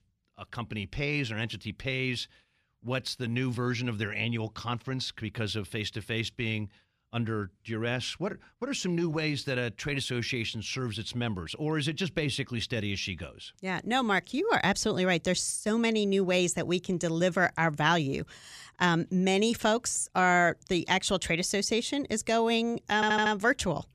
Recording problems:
audio stuttering; at 23 s

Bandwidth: 14.5 kHz